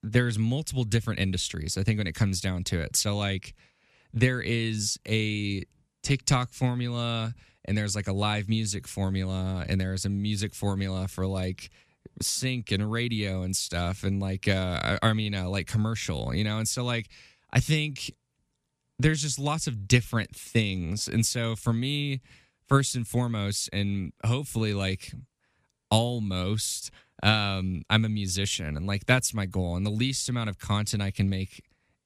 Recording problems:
none

